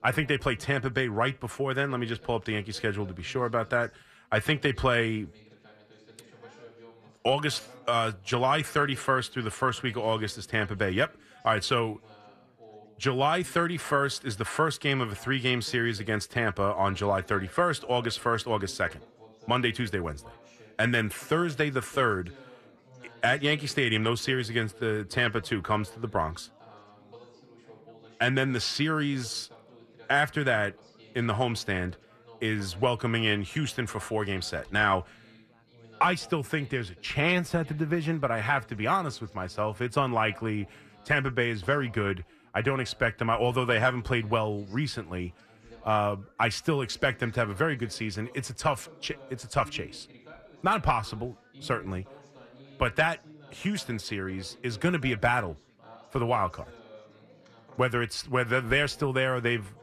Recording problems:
background chatter; faint; throughout; 4 voices, 25 dB below the speech

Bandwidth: 14 kHz